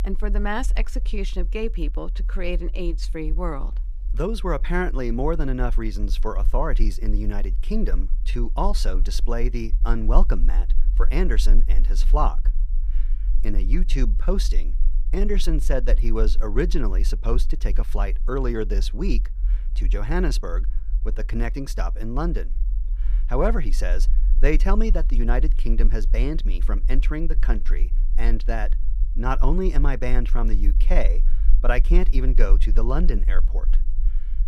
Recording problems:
low rumble; faint; throughout; 20 dB below the speech

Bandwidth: 14.5 kHz